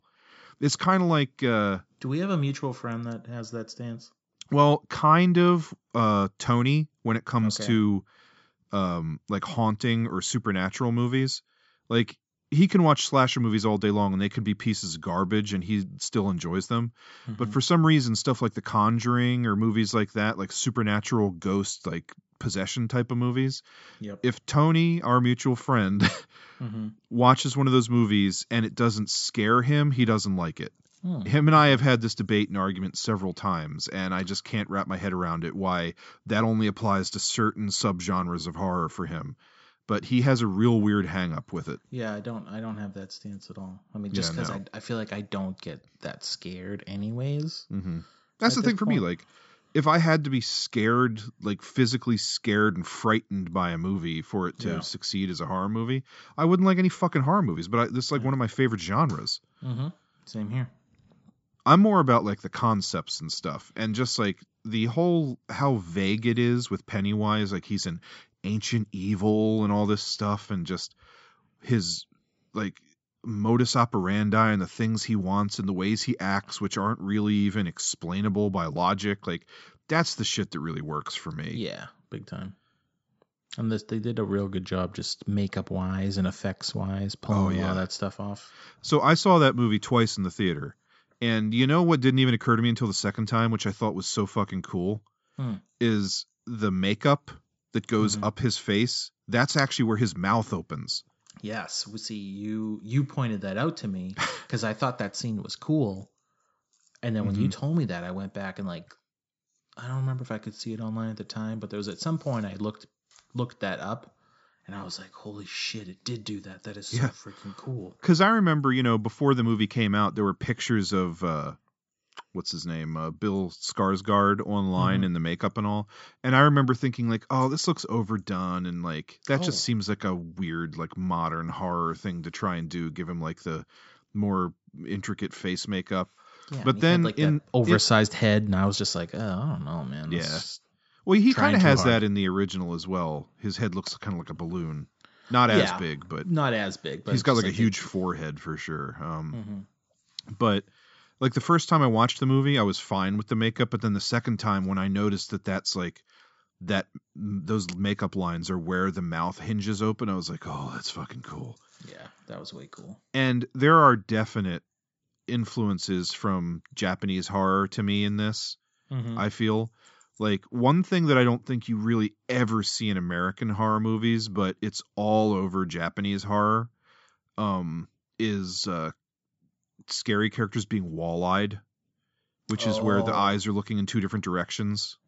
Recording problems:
high frequencies cut off; noticeable; nothing above 8 kHz

